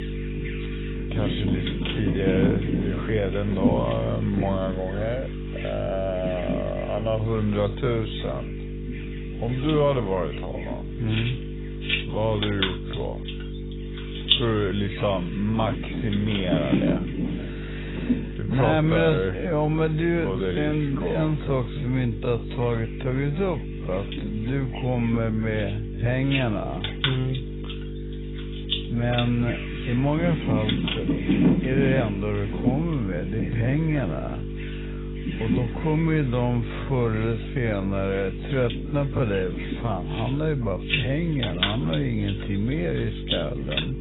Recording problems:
garbled, watery; badly; nothing above 4 kHz
wrong speed, natural pitch; too slow; 0.6 times normal speed
animal sounds; loud; throughout; 3 dB below the speech
electrical hum; noticeable; throughout; 50 Hz, 10 dB below the speech

